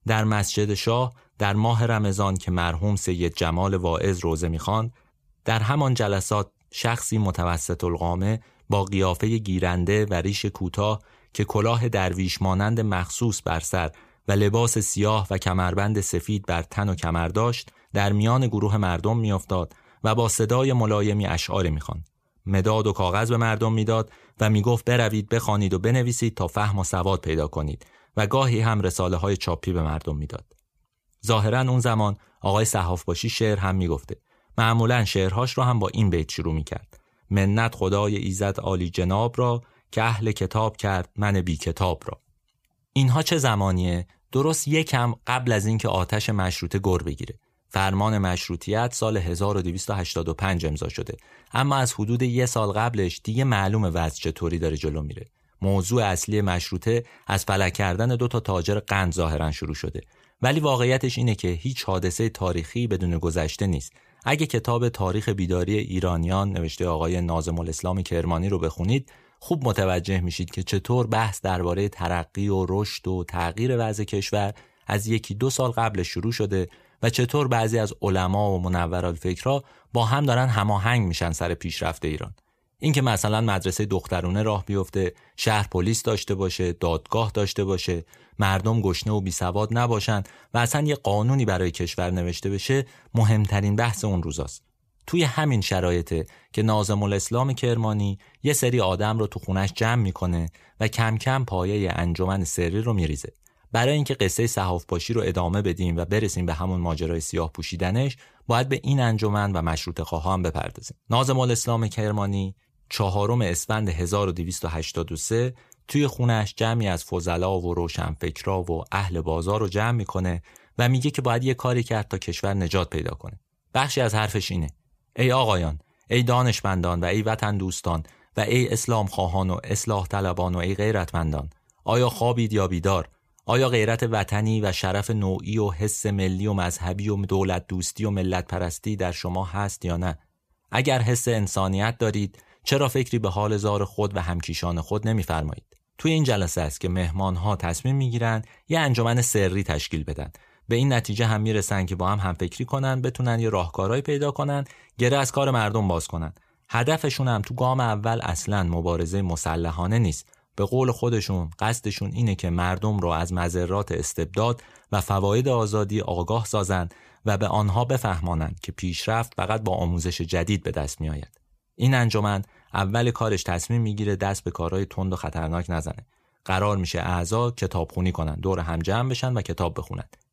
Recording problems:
none

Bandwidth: 15 kHz